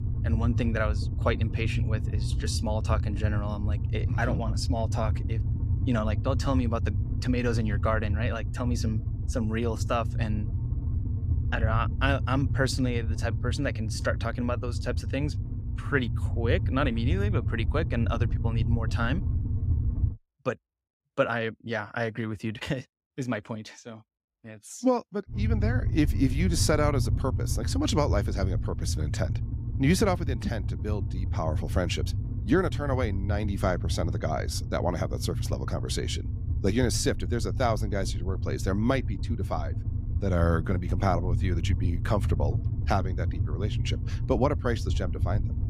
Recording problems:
low rumble; noticeable; until 20 s and from 25 s on; 15 dB below the speech

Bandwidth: 15.5 kHz